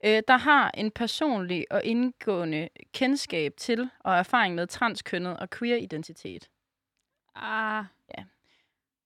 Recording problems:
none

